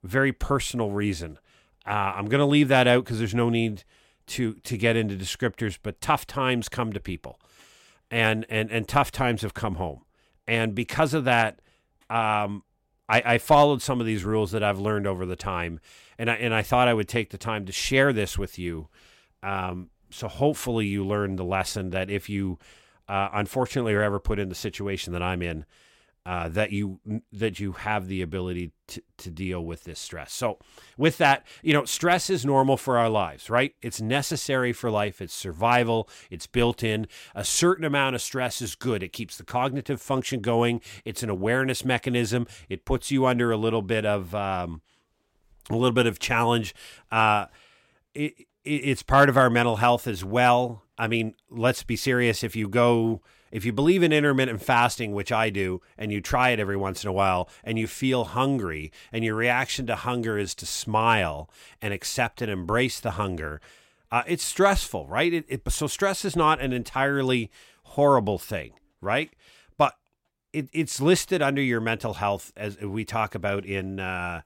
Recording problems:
none

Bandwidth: 16.5 kHz